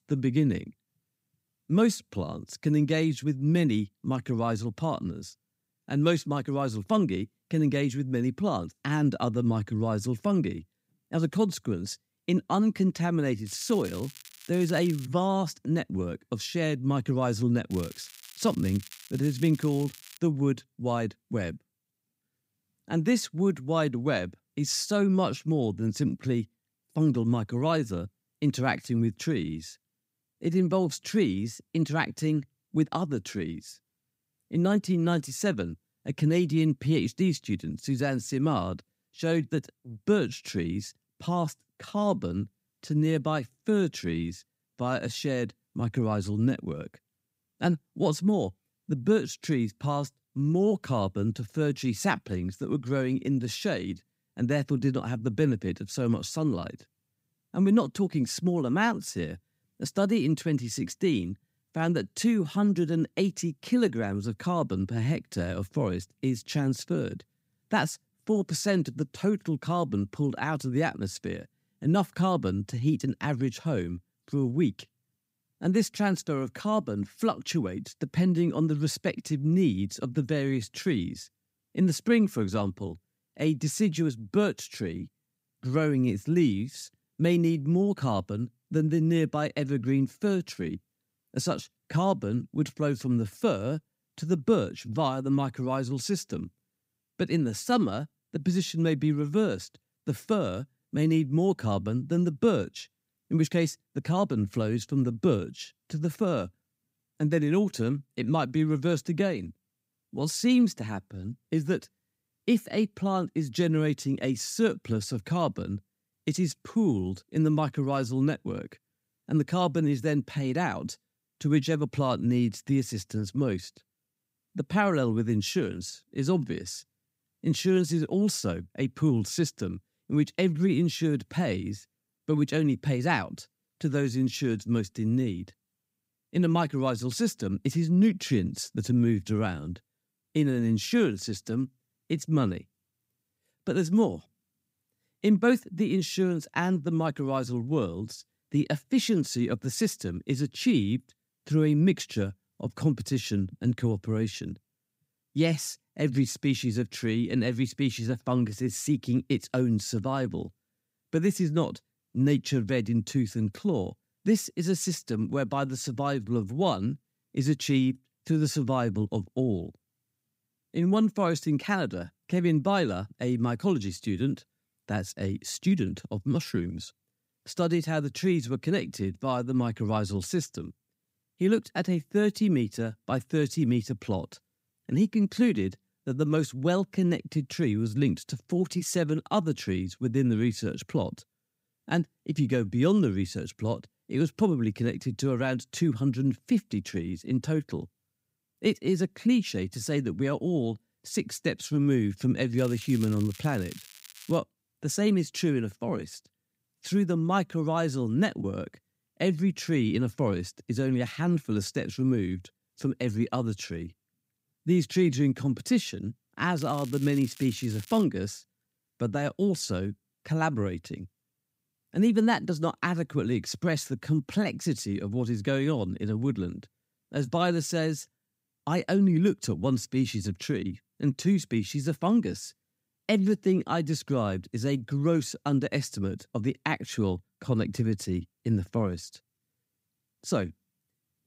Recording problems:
crackling; noticeable; 4 times, first at 13 s; 20 dB below the speech

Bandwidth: 15.5 kHz